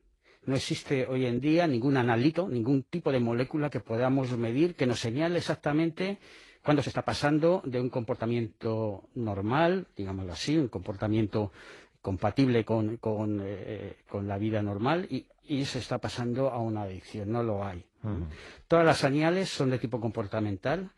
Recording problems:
garbled, watery; slightly; nothing above 11 kHz
uneven, jittery; strongly; from 1 to 19 s

